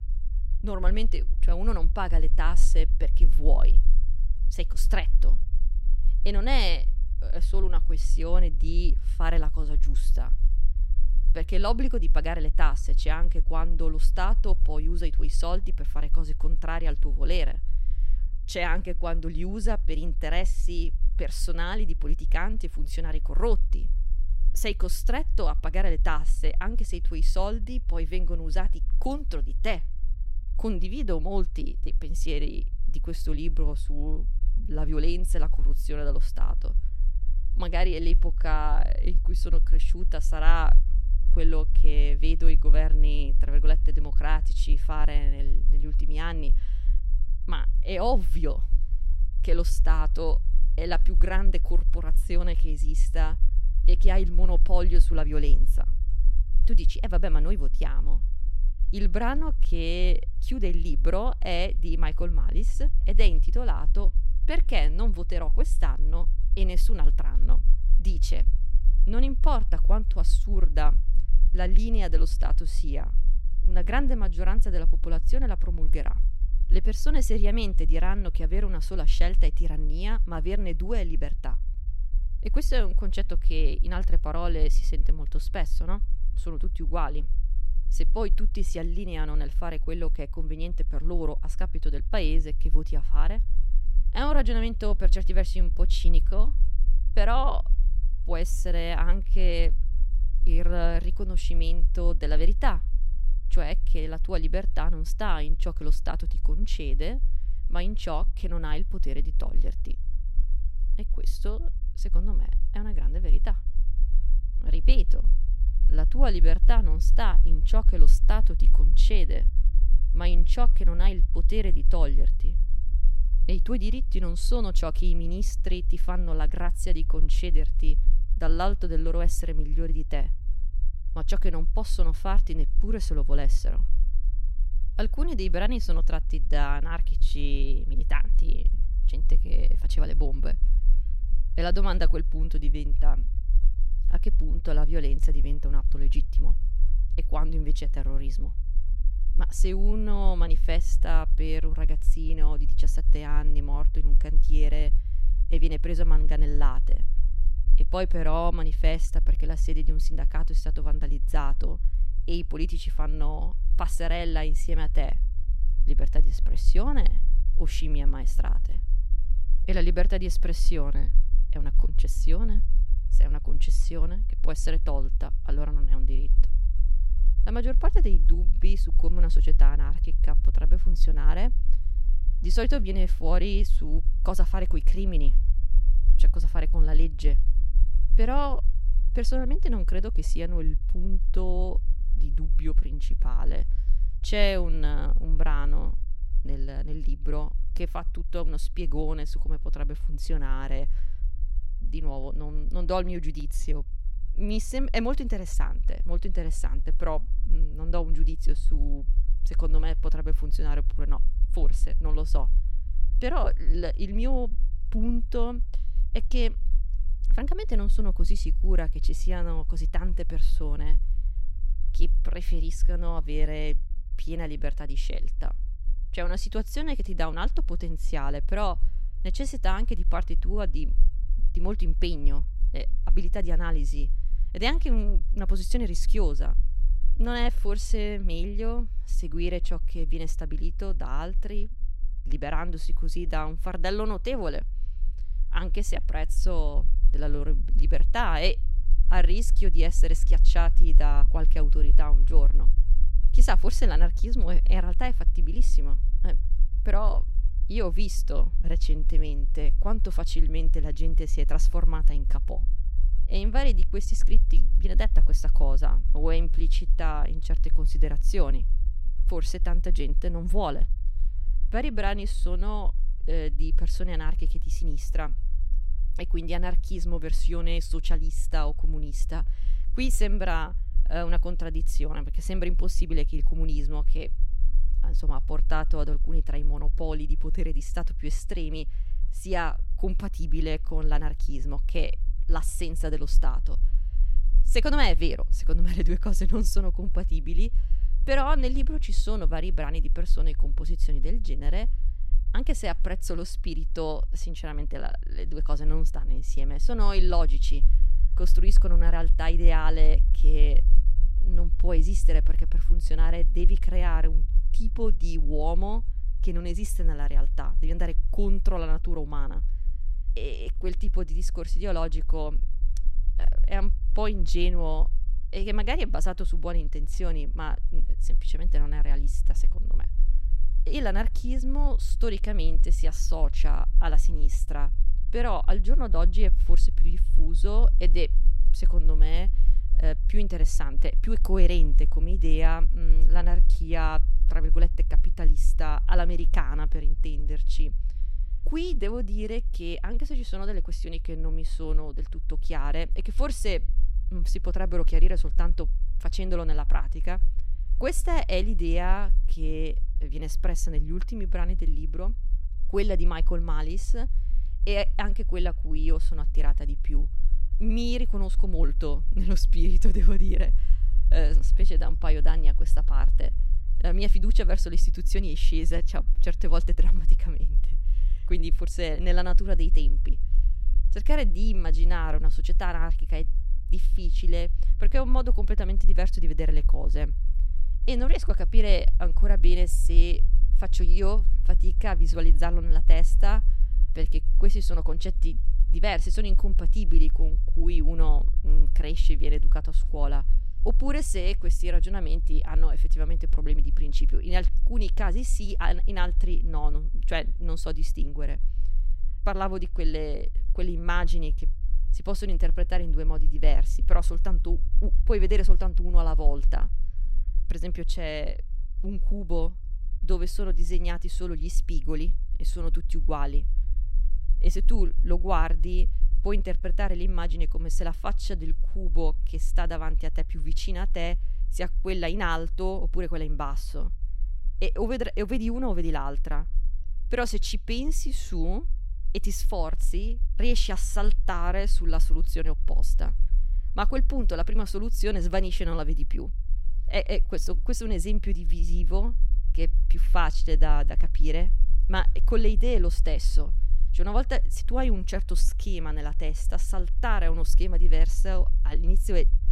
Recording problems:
low rumble; noticeable; throughout; 20 dB below the speech

